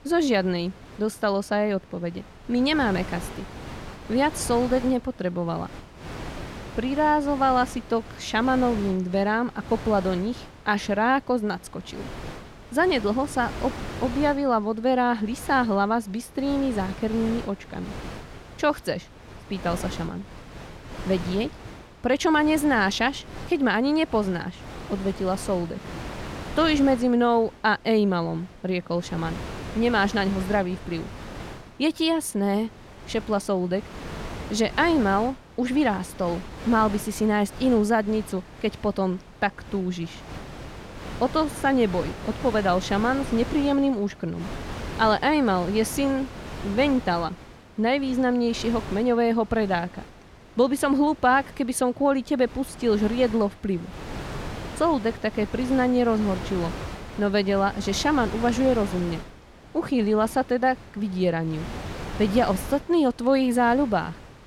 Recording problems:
wind noise on the microphone; occasional gusts; 15 dB below the speech

